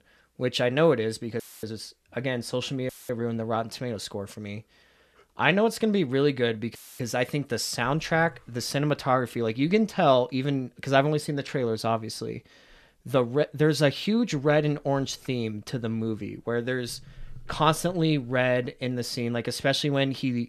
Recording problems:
audio cutting out; filled with static; at 1.5 s, at 3 s and at 7 s

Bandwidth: 13.5 kHz